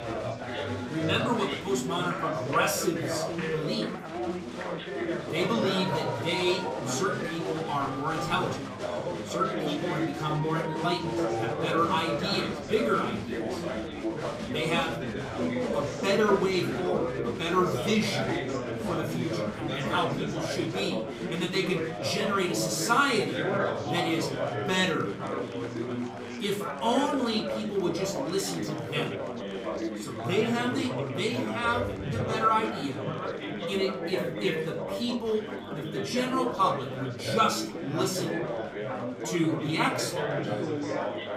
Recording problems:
off-mic speech; far
room echo; slight; dies away in 0.5 s
chatter from many people; loud; throughout; 3 dB below the speech
background music; faint; throughout; 25 dB below the speech

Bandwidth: 15.5 kHz